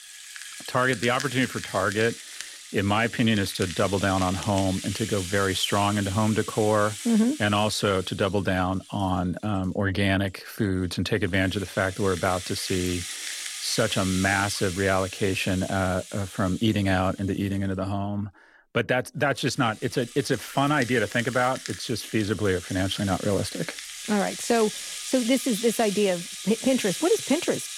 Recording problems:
background music; loud; throughout; 9 dB below the speech

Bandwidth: 16.5 kHz